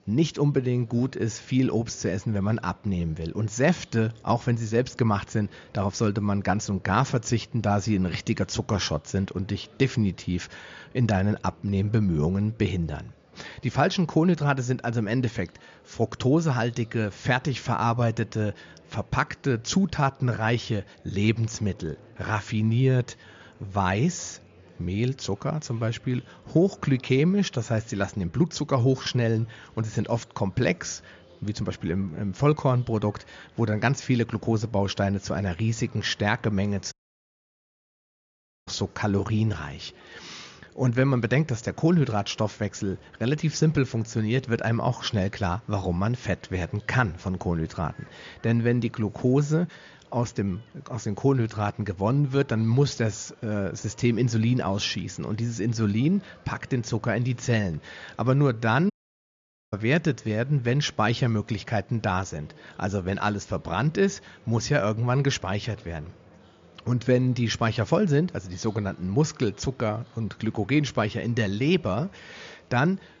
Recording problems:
high frequencies cut off; noticeable; nothing above 7 kHz
murmuring crowd; faint; throughout; 30 dB below the speech
audio cutting out; at 37 s for 2 s and at 59 s for 1 s

